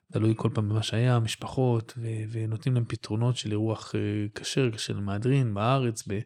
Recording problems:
none

